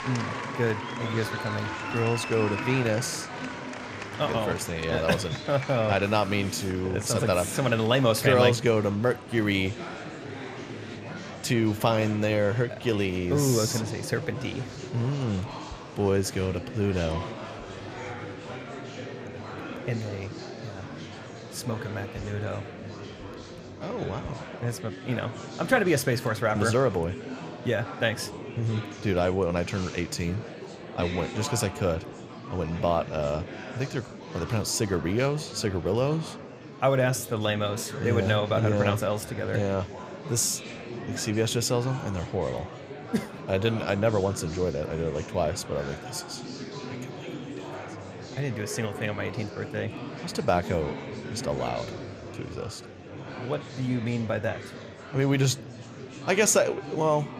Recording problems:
murmuring crowd; noticeable; throughout; 10 dB below the speech

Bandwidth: 14.5 kHz